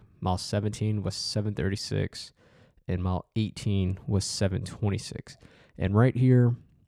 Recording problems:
none

